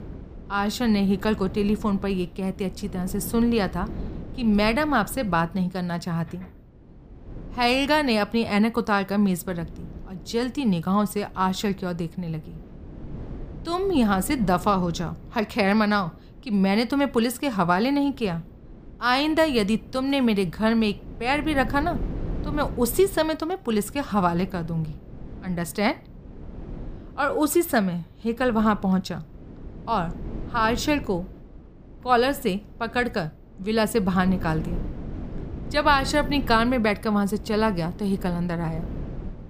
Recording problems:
wind noise on the microphone; occasional gusts; 20 dB below the speech

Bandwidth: 15 kHz